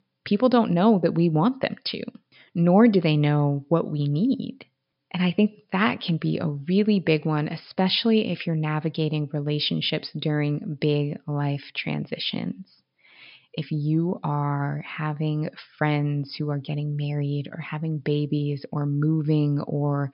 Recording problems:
high frequencies cut off; noticeable; nothing above 5.5 kHz

